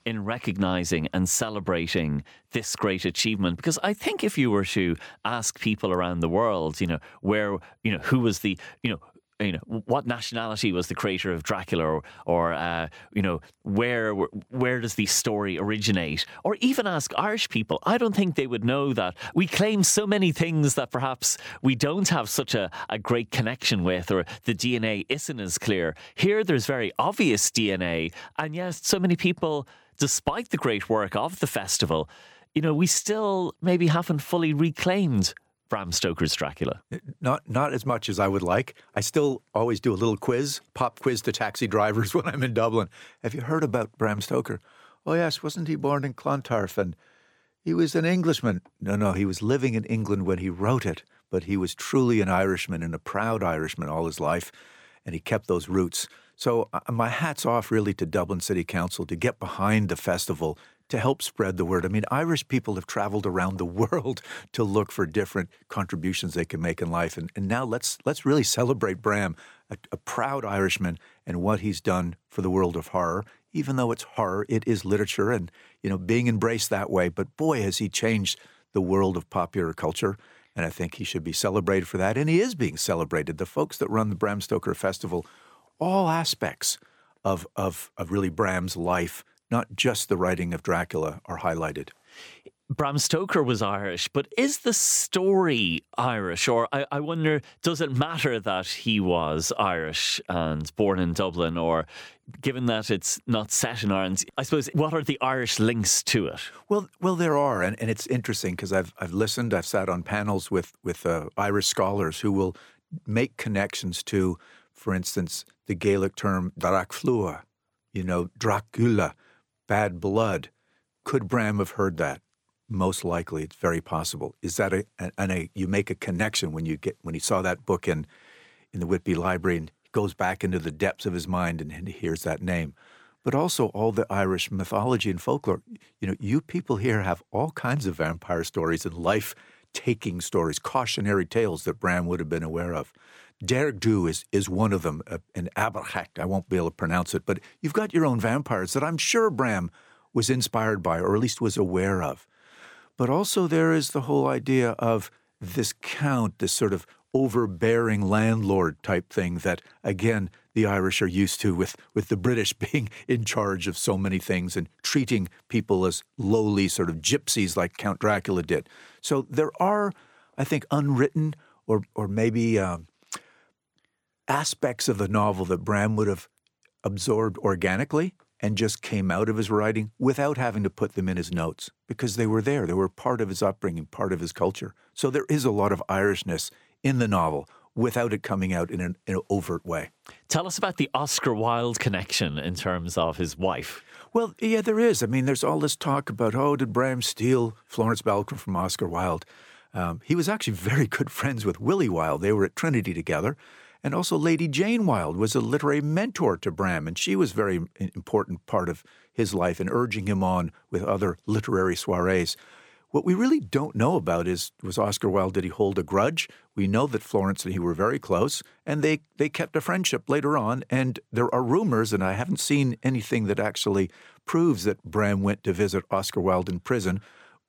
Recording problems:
none

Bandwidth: 18.5 kHz